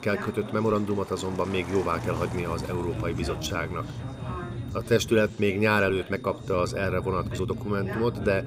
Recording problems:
traffic noise; noticeable; throughout; 15 dB below the speech
background chatter; noticeable; throughout; 4 voices, 10 dB below the speech
low rumble; noticeable; from 2 to 5.5 s and from 6.5 s on; 20 dB below the speech
high-pitched whine; faint; throughout; 3.5 kHz, 30 dB below the speech
uneven, jittery; strongly; from 0.5 to 8 s

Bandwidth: 15.5 kHz